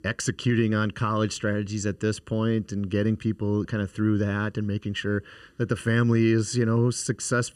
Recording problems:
none

